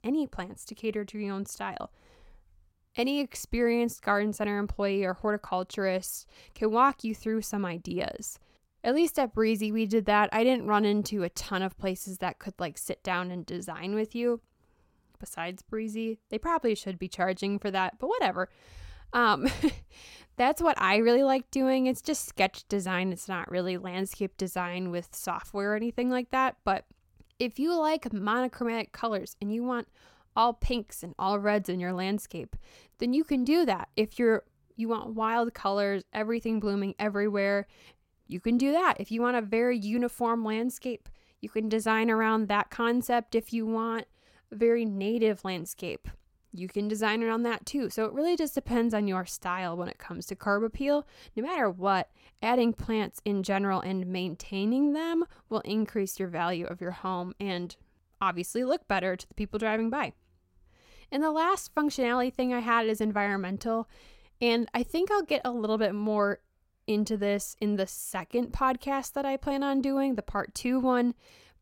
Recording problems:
none

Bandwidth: 16.5 kHz